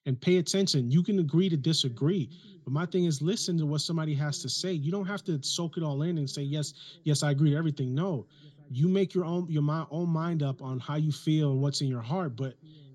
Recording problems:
room echo; slight; dies away in 3 s

